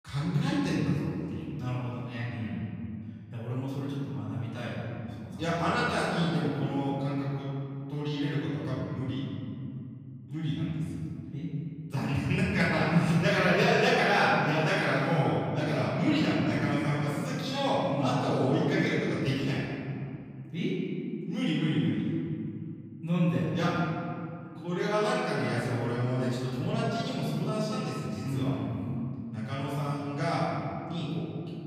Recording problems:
room echo; strong; dies away in 2.7 s
off-mic speech; far

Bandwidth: 15 kHz